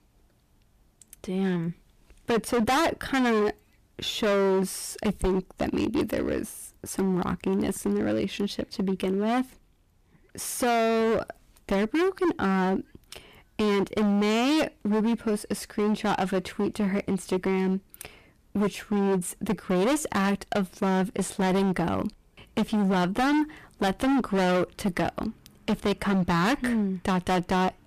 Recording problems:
distortion; heavy; 18% of the sound clipped

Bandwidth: 14.5 kHz